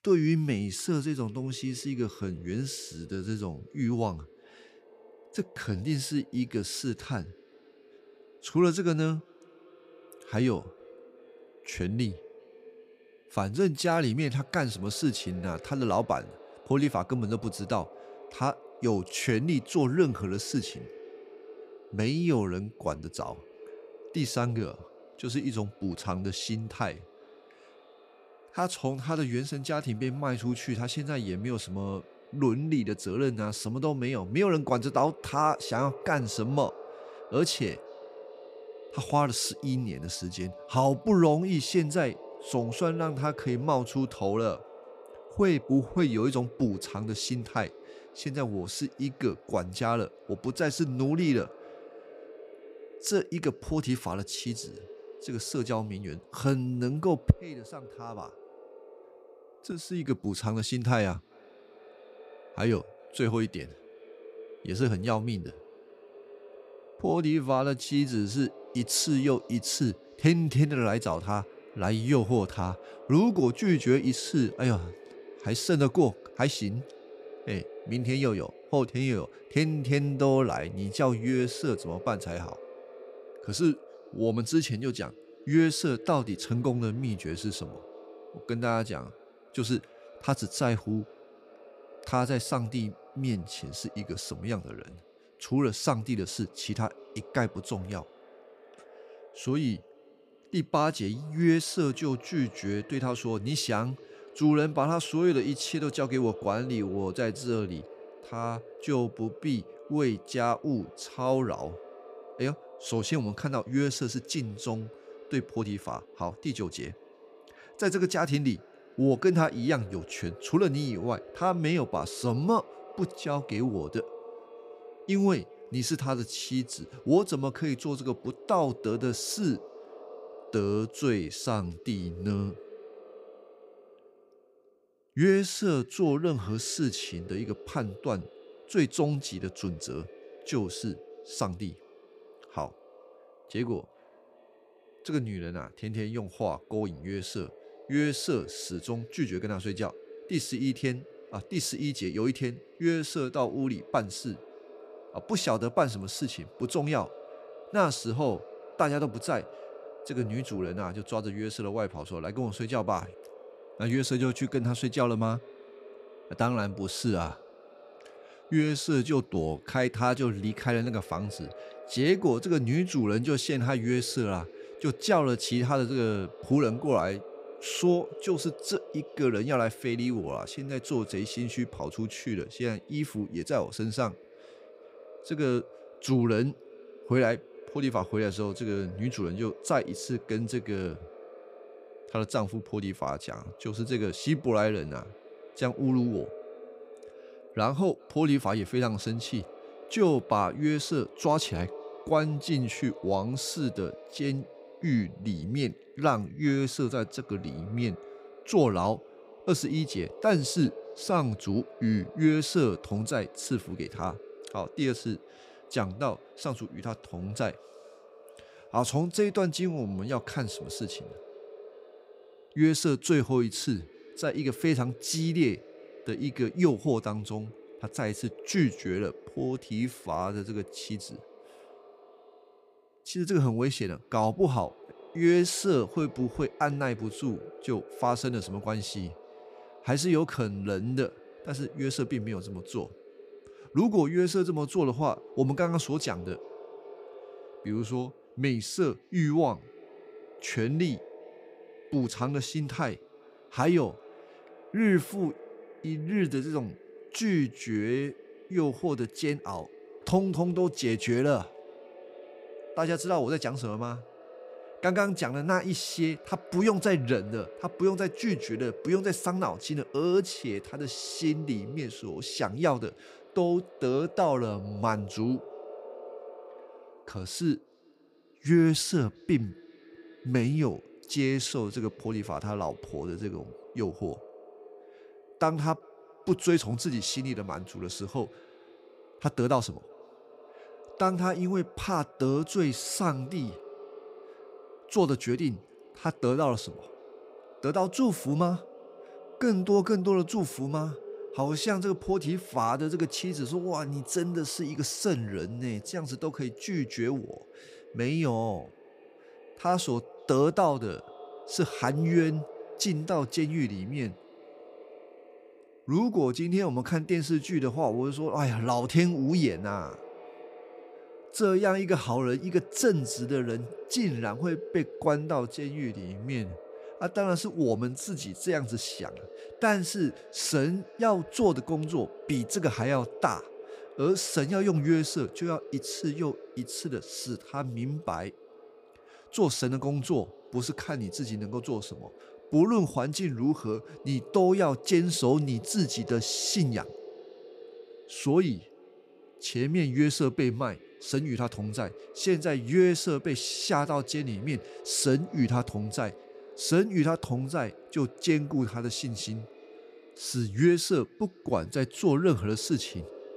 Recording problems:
echo of what is said; faint; throughout; 390 ms later, 20 dB below the speech

